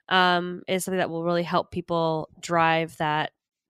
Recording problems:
none

